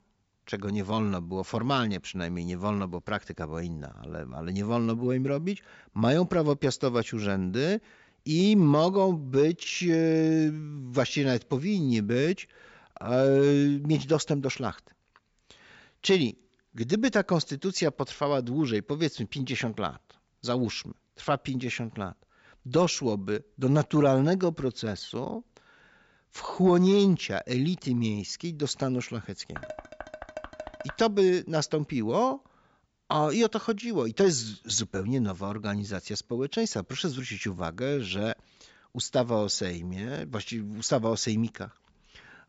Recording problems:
high frequencies cut off; noticeable; nothing above 8 kHz
clattering dishes; faint; from 30 to 31 s; peak 15 dB below the speech

